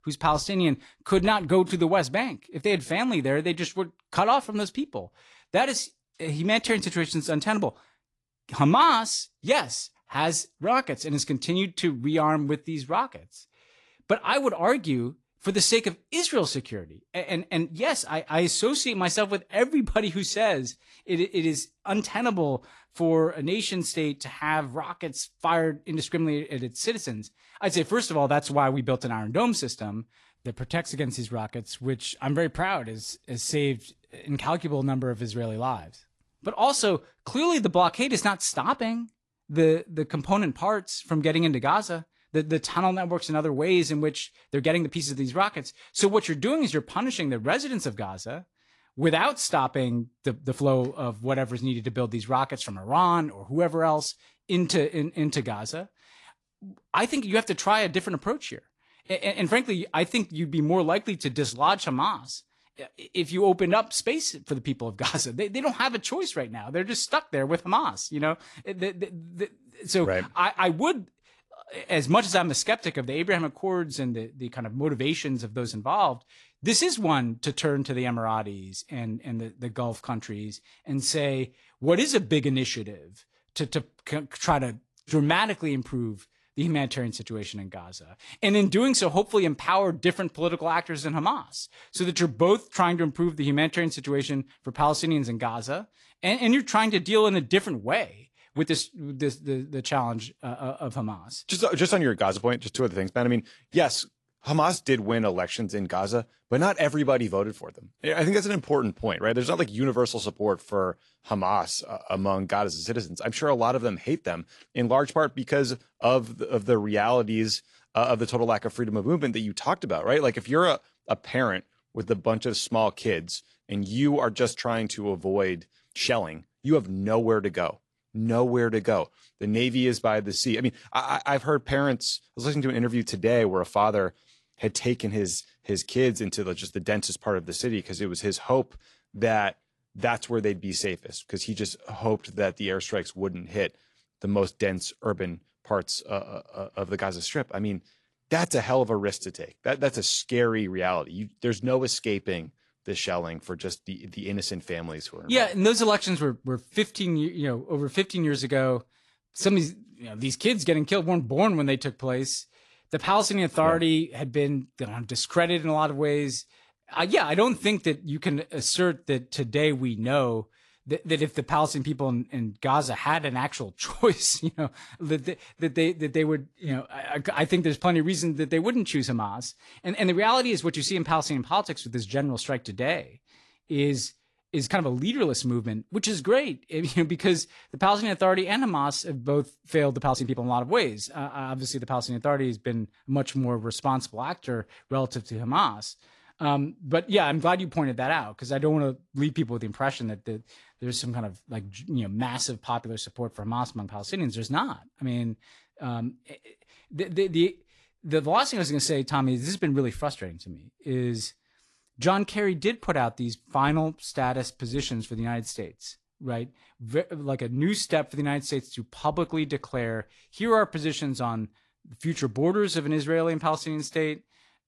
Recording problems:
garbled, watery; slightly; nothing above 11 kHz
uneven, jittery; strongly; from 44 s to 3:21

